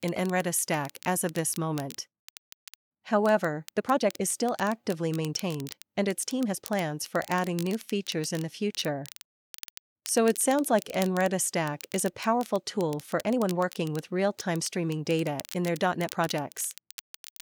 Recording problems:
crackle, like an old record; noticeable; 15 dB below the speech
uneven, jittery; strongly; from 1 to 16 s

